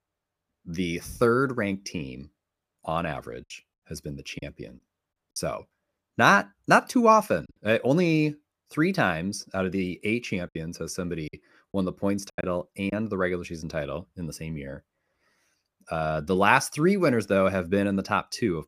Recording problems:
choppy; very; from 4.5 to 7.5 s and from 11 to 13 s; 6% of the speech affected

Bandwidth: 15 kHz